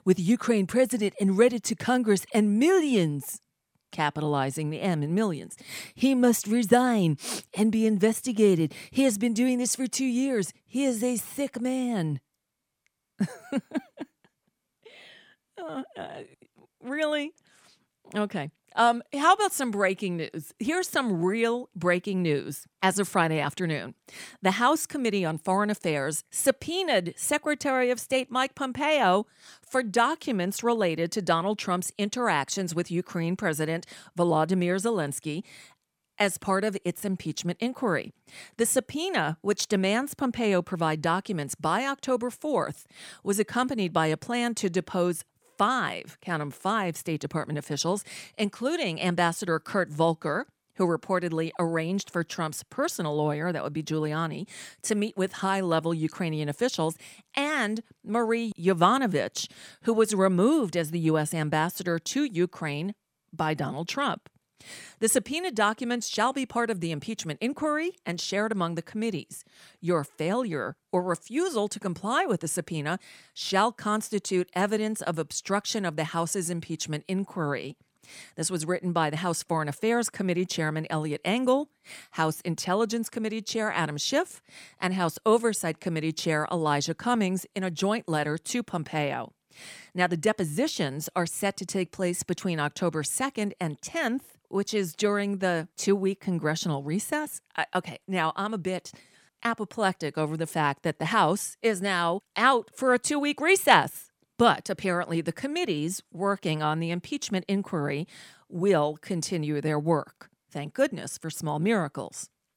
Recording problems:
none

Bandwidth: 18.5 kHz